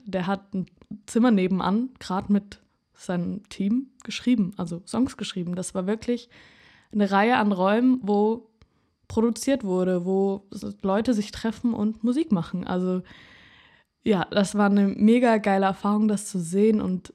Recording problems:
none

